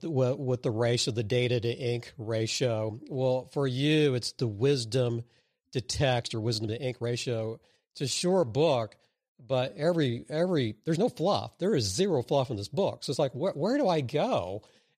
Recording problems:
uneven, jittery; strongly; from 6 to 14 s

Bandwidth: 14.5 kHz